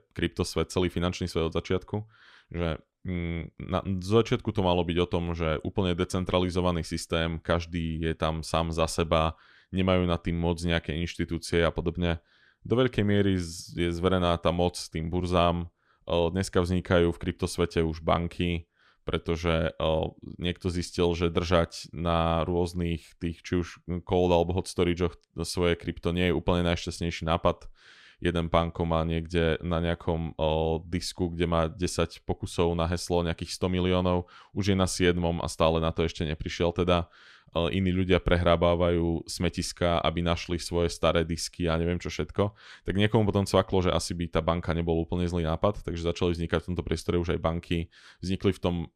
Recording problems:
none

